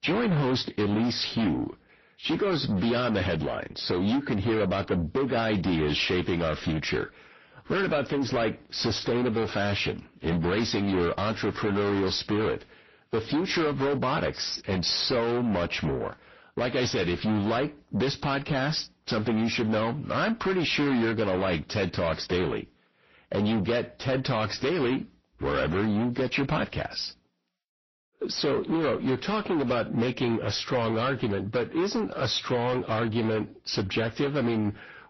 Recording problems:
distortion; heavy; 7 dB below the speech
garbled, watery; slightly; nothing above 6 kHz

